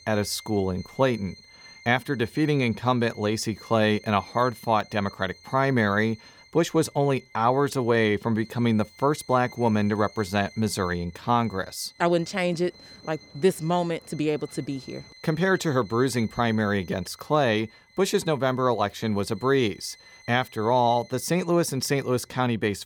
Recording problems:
background music; faint; throughout; 25 dB below the speech

